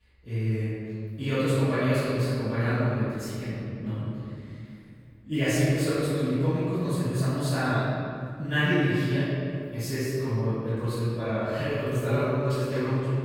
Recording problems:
room echo; strong; dies away in 2.3 s
off-mic speech; far

